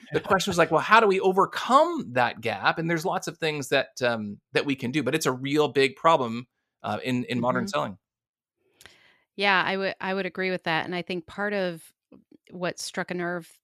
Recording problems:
none

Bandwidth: 14.5 kHz